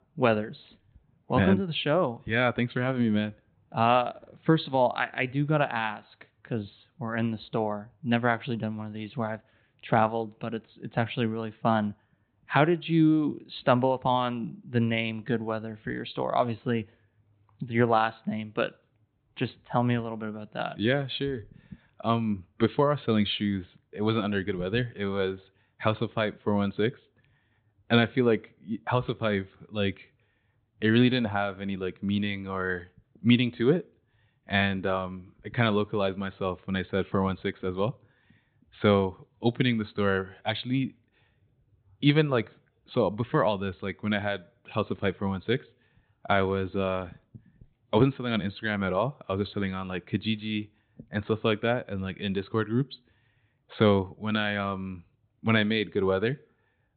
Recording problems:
high frequencies cut off; severe; nothing above 4 kHz

